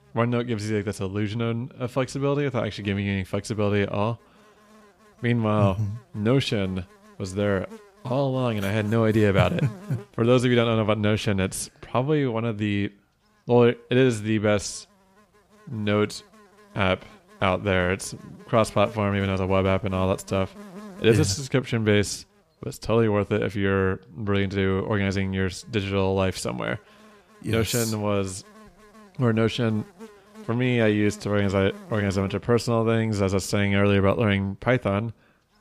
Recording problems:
electrical hum; faint; throughout; 50 Hz, 25 dB below the speech

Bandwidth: 15 kHz